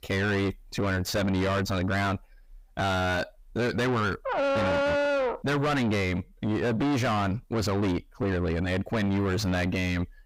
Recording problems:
distortion; heavy; 5 dB below the speech
dog barking; loud; from 4.5 to 5.5 s; peak 4 dB above the speech

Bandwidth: 15.5 kHz